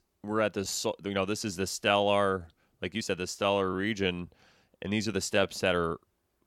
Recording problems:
uneven, jittery; strongly; from 0.5 to 6 s

